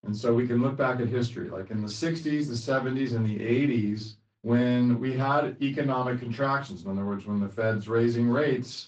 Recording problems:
off-mic speech; far
room echo; very slight; dies away in 0.2 s
garbled, watery; slightly

